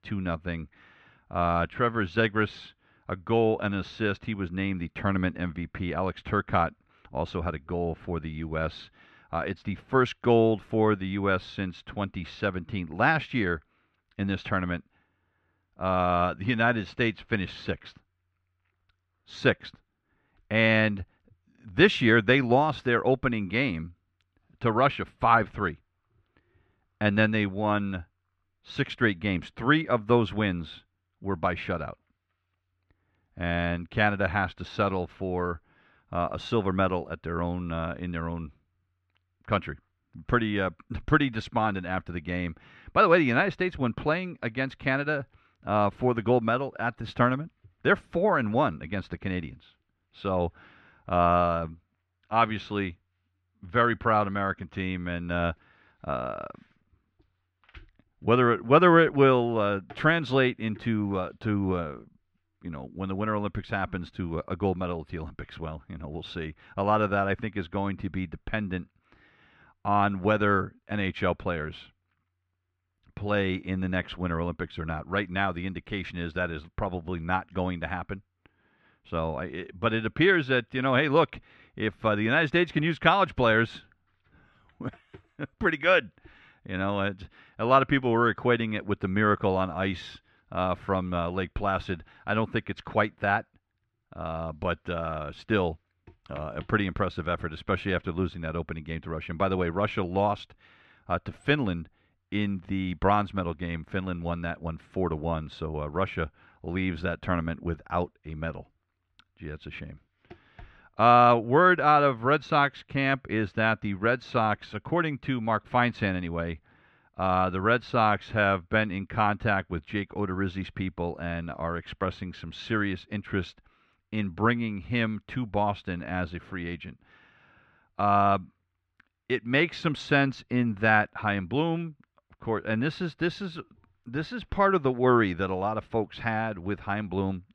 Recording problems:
muffled; slightly; fading above 2.5 kHz

